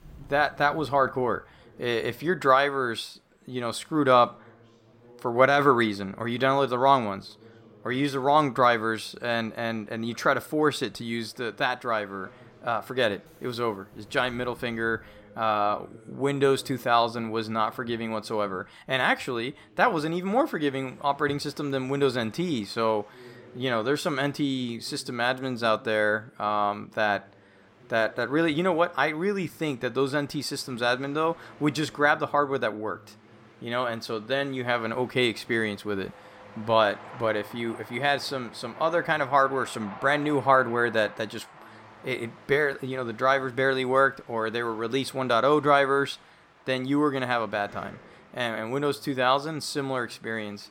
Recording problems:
train or aircraft noise; faint; throughout; 25 dB below the speech
voice in the background; faint; throughout; 30 dB below the speech

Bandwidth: 16.5 kHz